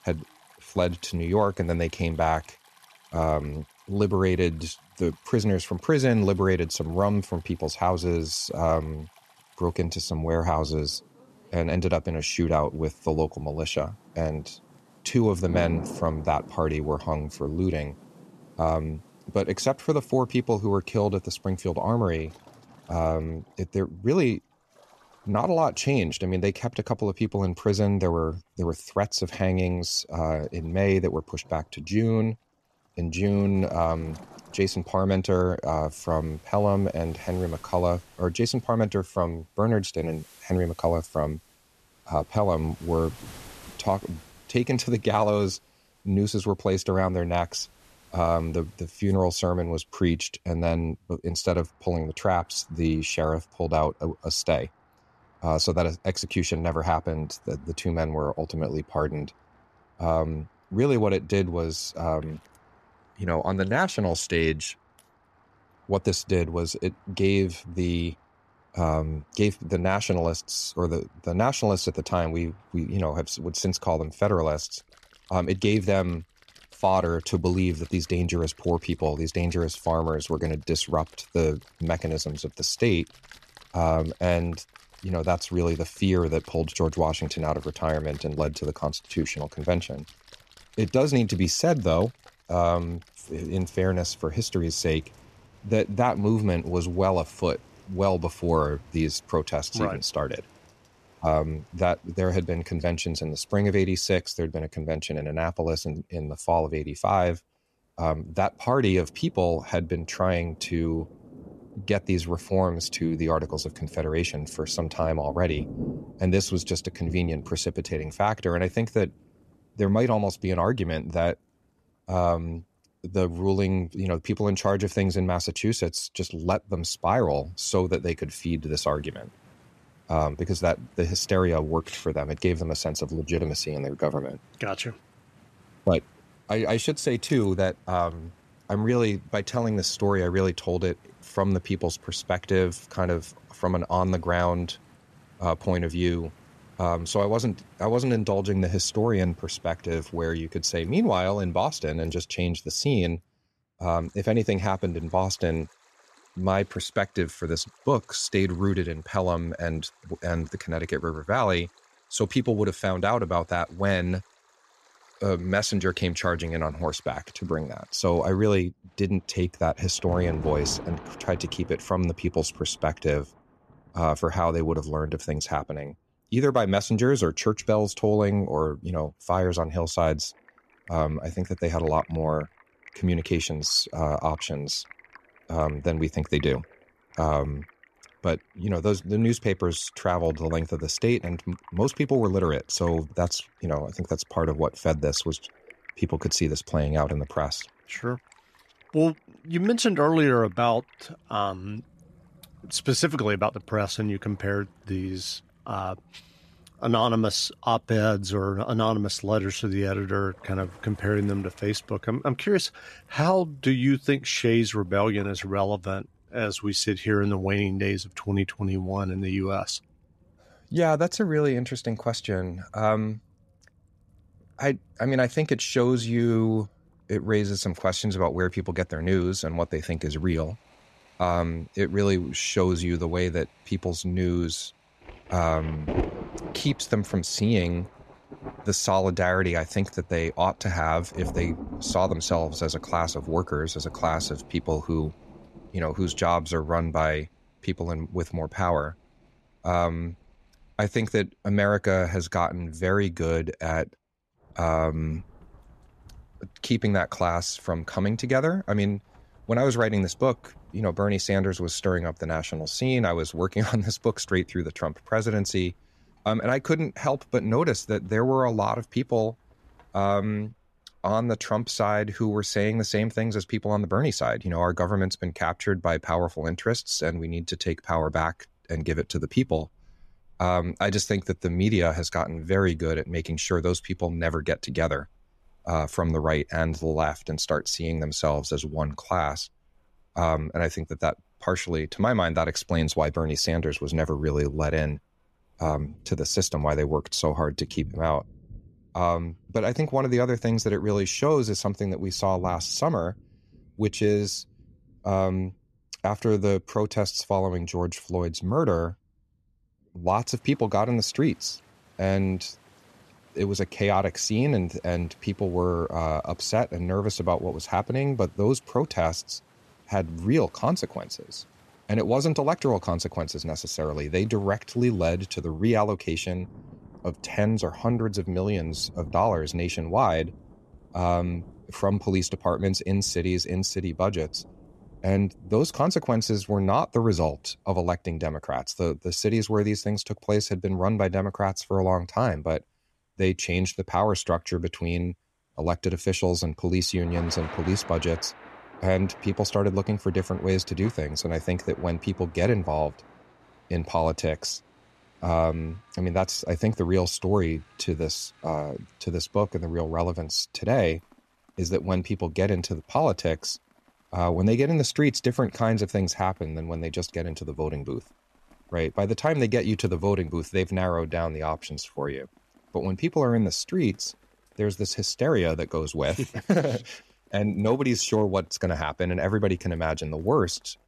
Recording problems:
rain or running water; faint; throughout; 20 dB below the speech

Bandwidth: 13.5 kHz